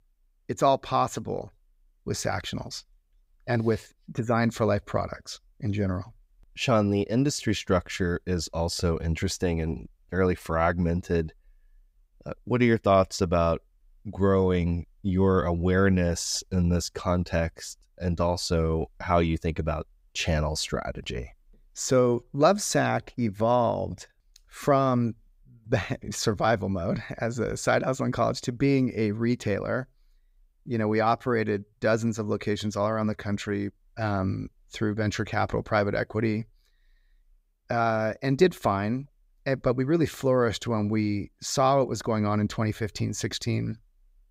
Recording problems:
none

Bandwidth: 15.5 kHz